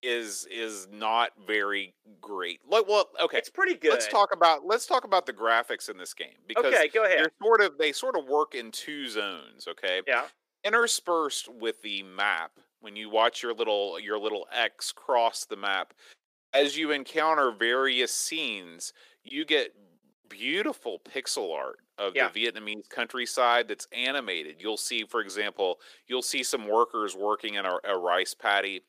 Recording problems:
thin; somewhat; fading below 350 Hz

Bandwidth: 15 kHz